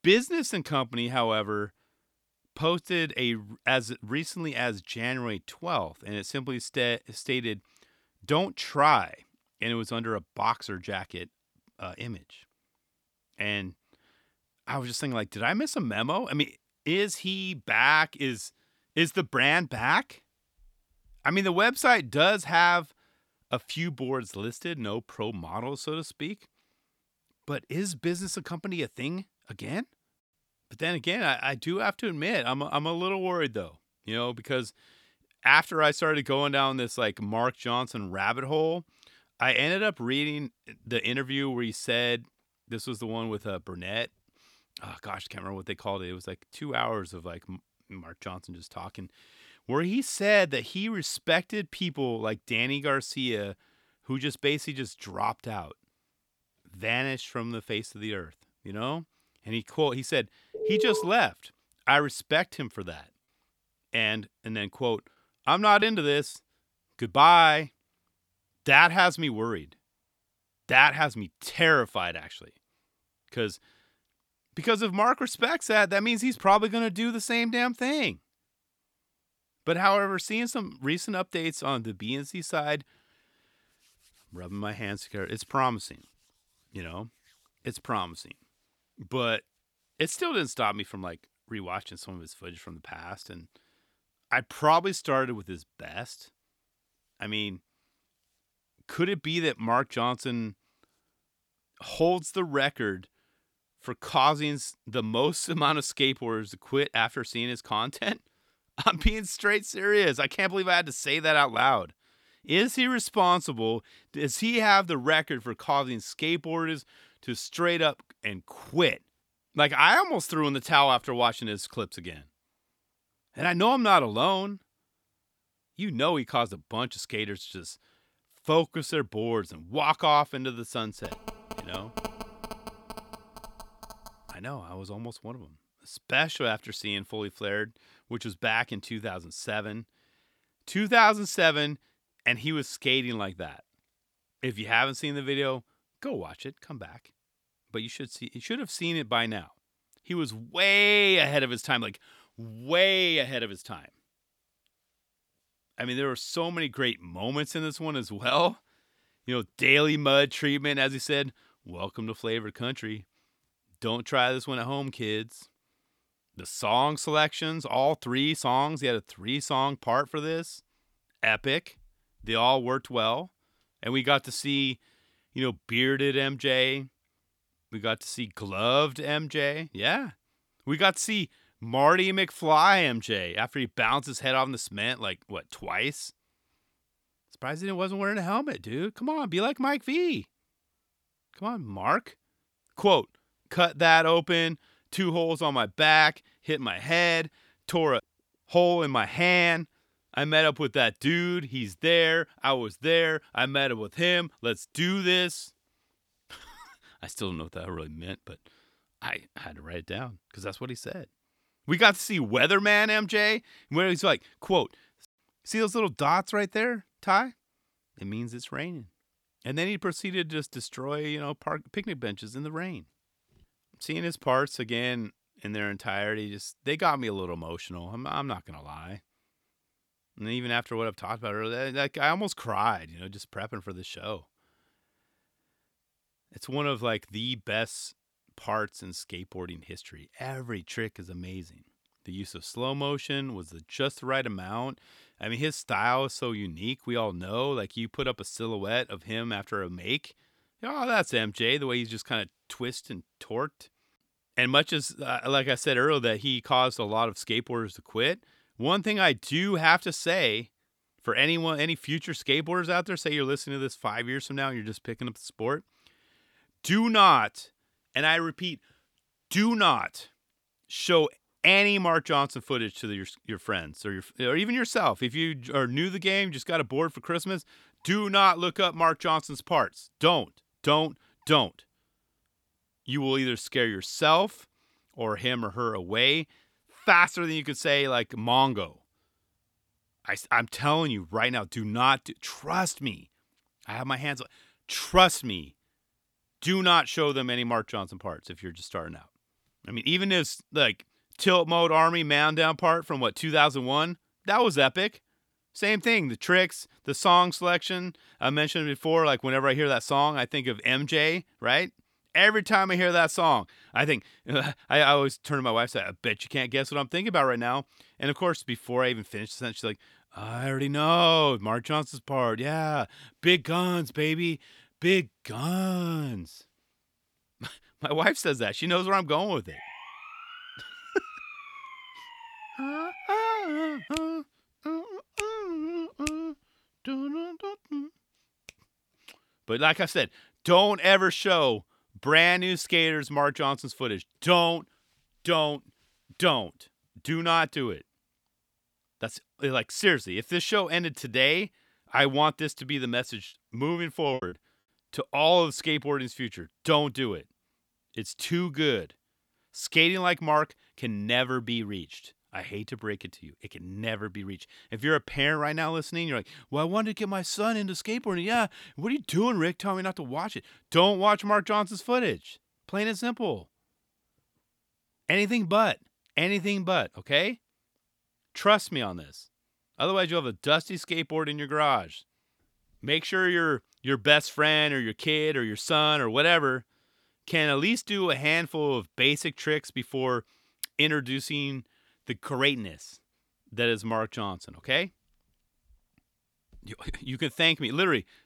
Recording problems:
alarm; noticeable; at 1:01; peak 1 dB below the speech
choppy; very; at 1:06 and at 5:54; 6% of the speech affected
phone ringing; faint; from 2:11 to 2:14; peak 10 dB below the speech
siren; faint; from 5:29 to 5:34; peak 15 dB below the speech

